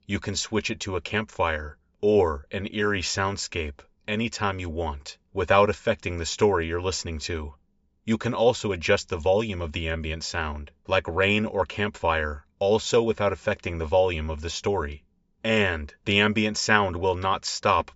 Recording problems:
high frequencies cut off; noticeable; nothing above 8 kHz

